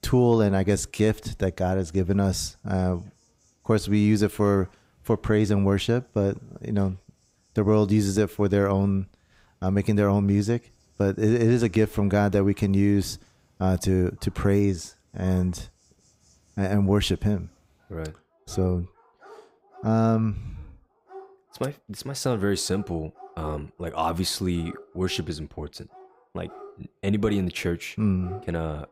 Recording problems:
animal sounds; faint; throughout; 25 dB below the speech

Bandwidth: 15.5 kHz